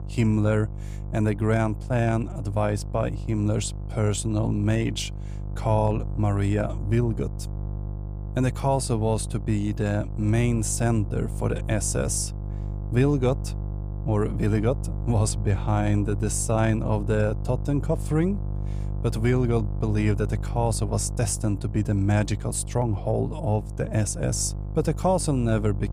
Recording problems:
electrical hum; noticeable; throughout; 50 Hz, 15 dB below the speech

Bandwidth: 15 kHz